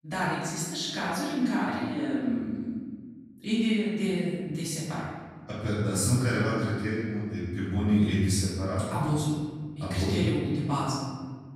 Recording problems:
room echo; strong; dies away in 1.6 s
off-mic speech; far

